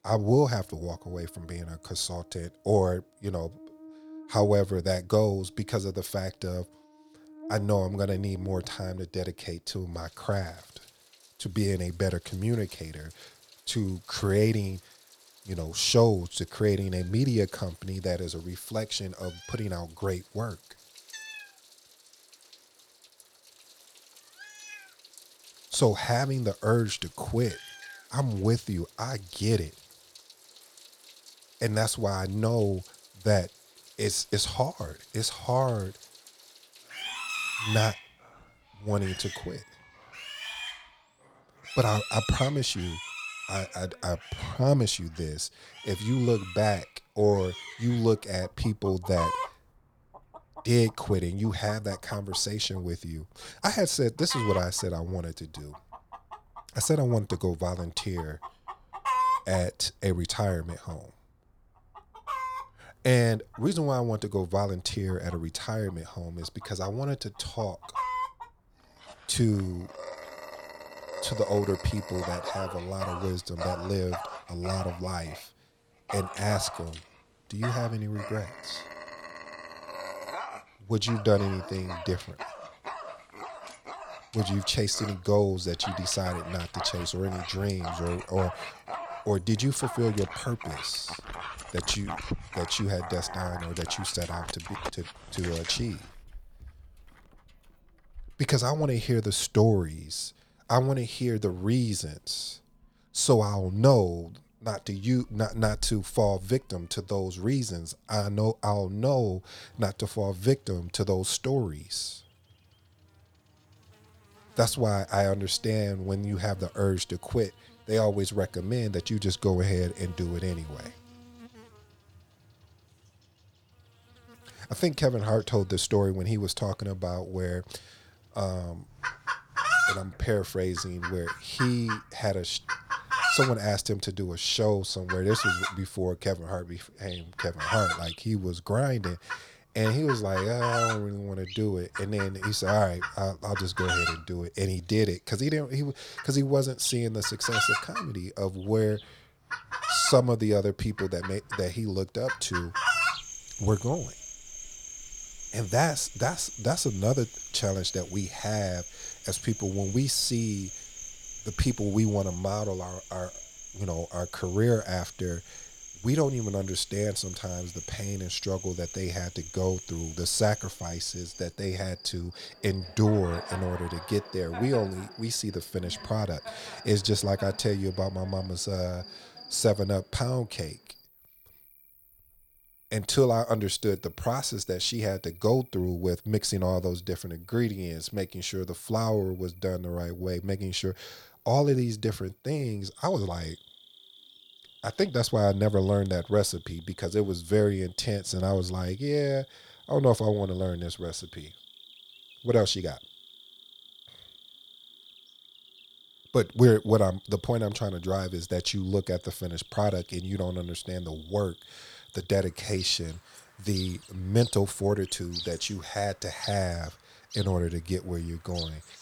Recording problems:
animal sounds; loud; throughout; 8 dB below the speech

